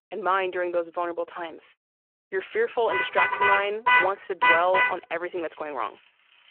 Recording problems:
phone-call audio
traffic noise; very loud; from 3 s on; 5 dB above the speech

